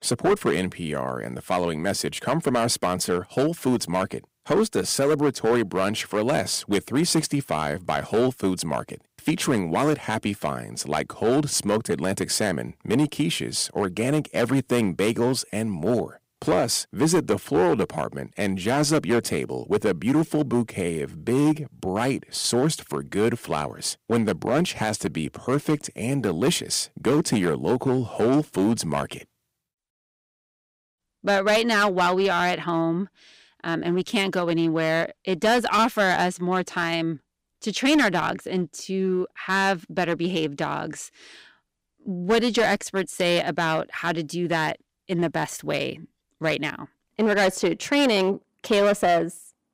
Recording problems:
distortion; slight; 6% of the sound clipped

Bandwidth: 15.5 kHz